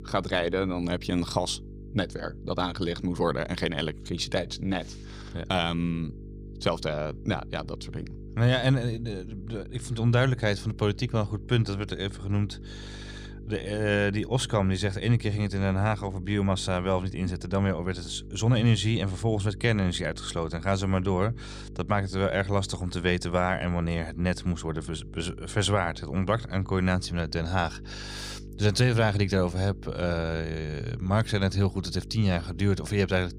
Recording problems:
electrical hum; faint; throughout; 50 Hz, 20 dB below the speech

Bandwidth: 15 kHz